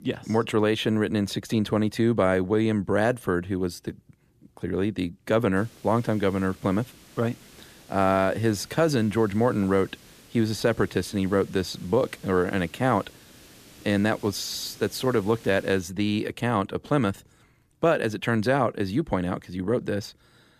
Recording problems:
hiss; faint; from 5.5 to 16 s; 25 dB below the speech

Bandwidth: 14.5 kHz